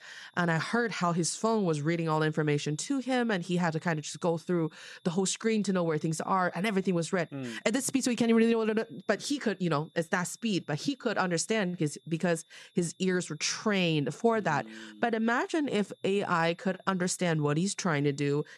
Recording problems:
high-pitched whine; faint; throughout; 3.5 kHz, 35 dB below the speech

